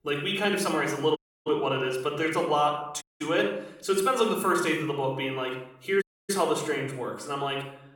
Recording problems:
room echo; slight; dies away in 0.6 s
off-mic speech; somewhat distant
audio cutting out; at 1 s, at 3 s and at 6 s

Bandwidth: 17.5 kHz